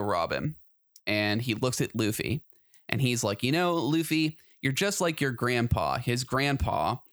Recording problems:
abrupt cut into speech; at the start

